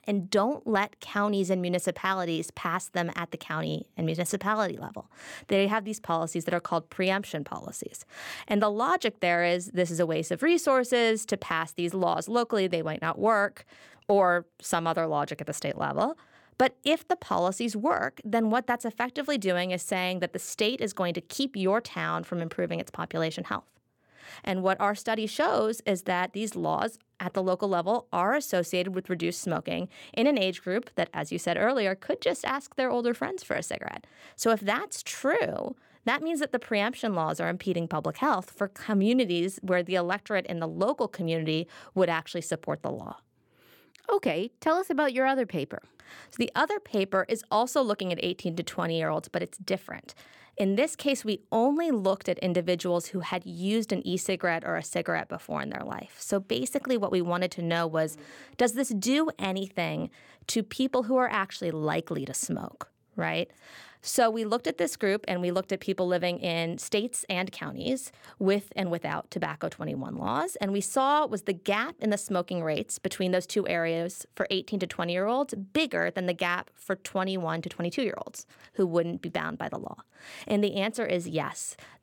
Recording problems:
none

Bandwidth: 17.5 kHz